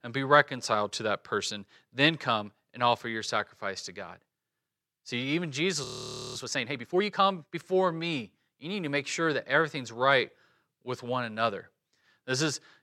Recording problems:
audio freezing; at 6 s for 0.5 s

